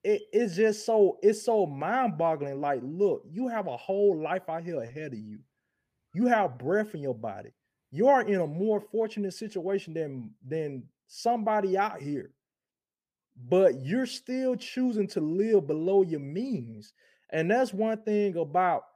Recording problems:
none

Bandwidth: 15 kHz